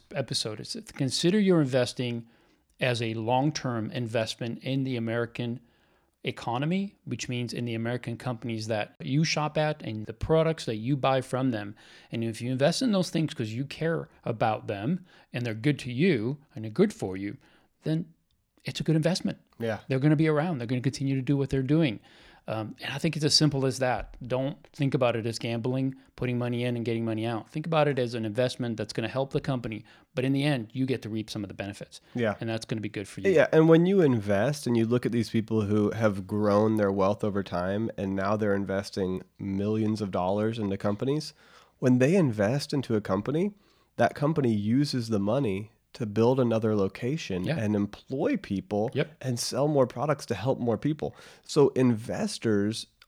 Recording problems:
none

